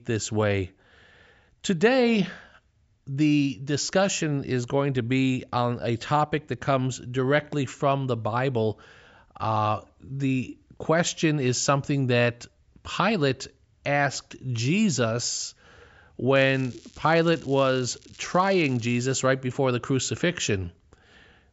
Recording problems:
high frequencies cut off; noticeable; nothing above 8 kHz
crackling; faint; from 16 to 19 s; 25 dB below the speech

